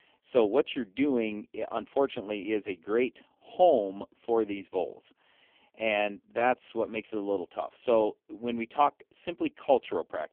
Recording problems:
phone-call audio; poor line; nothing above 3 kHz

